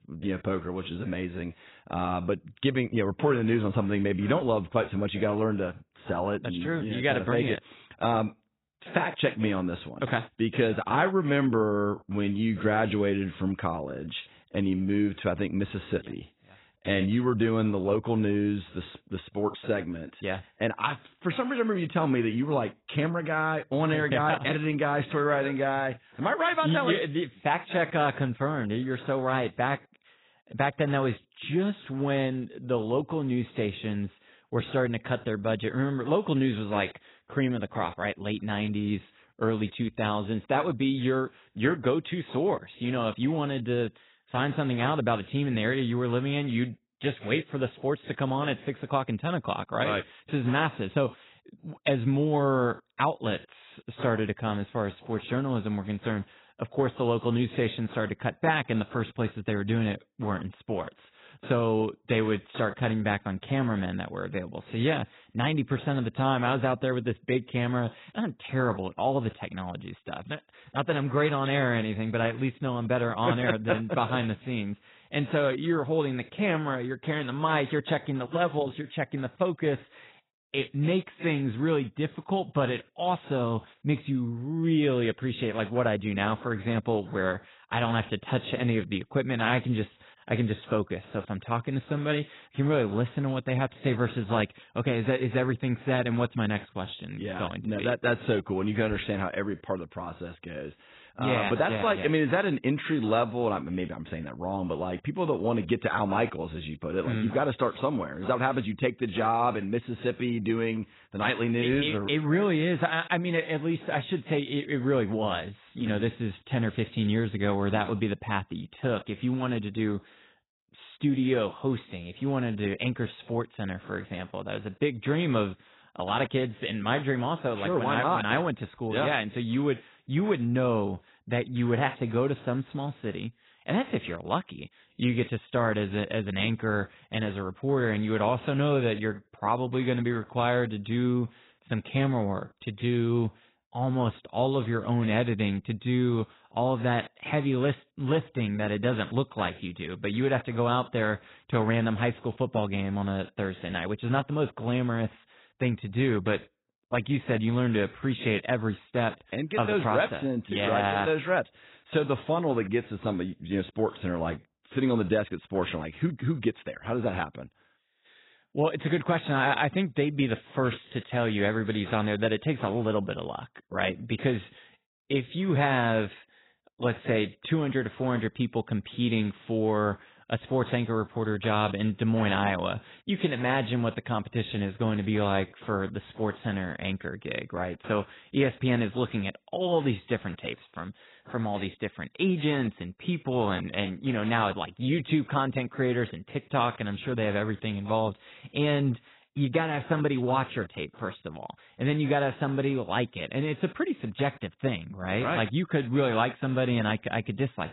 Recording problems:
garbled, watery; badly; nothing above 4 kHz

